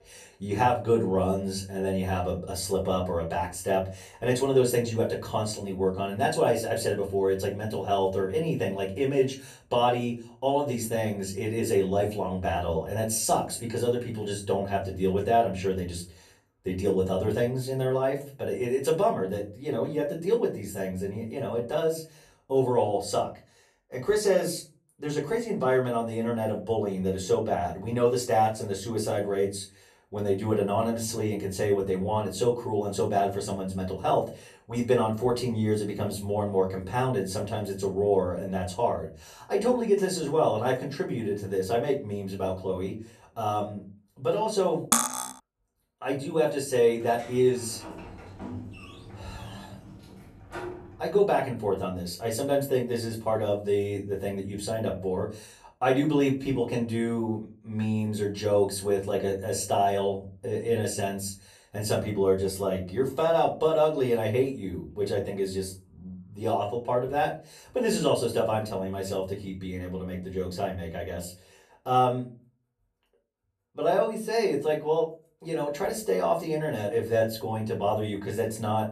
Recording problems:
off-mic speech; far
room echo; very slight; dies away in 0.3 s
clattering dishes; loud; at 45 s; peak 4 dB above the speech
door banging; faint; from 47 to 51 s; peak 10 dB below the speech

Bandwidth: 13.5 kHz